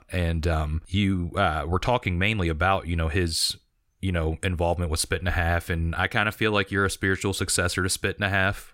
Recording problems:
none

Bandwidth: 16 kHz